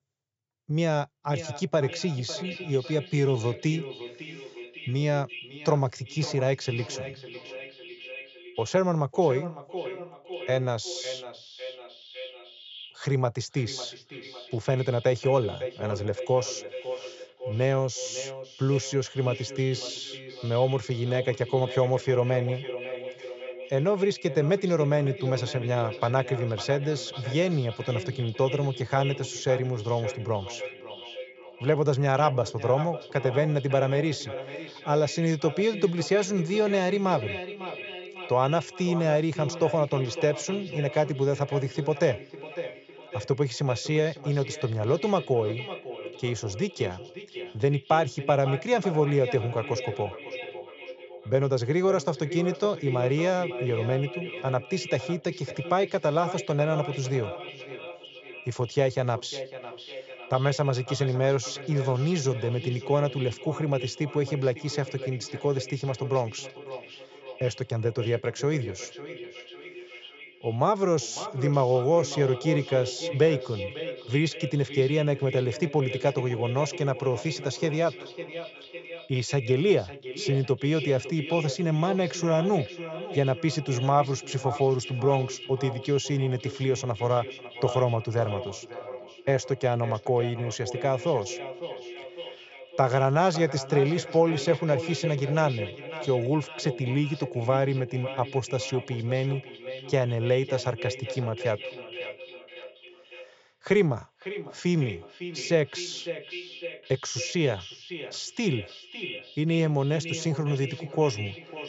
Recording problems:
echo of what is said; strong; throughout; 550 ms later, 10 dB below the speech
high frequencies cut off; noticeable; nothing above 8 kHz

